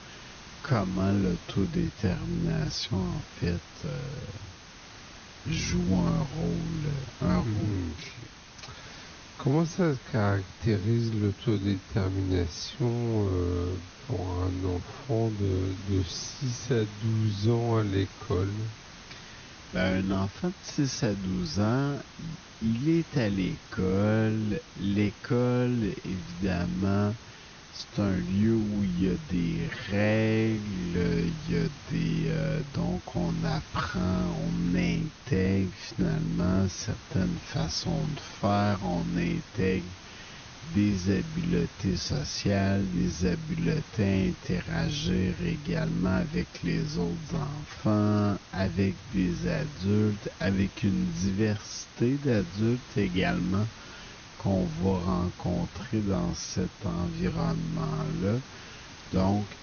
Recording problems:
wrong speed, natural pitch; too slow; 0.5 times normal speed
high frequencies cut off; noticeable; nothing above 6.5 kHz
hiss; noticeable; throughout; 15 dB below the speech

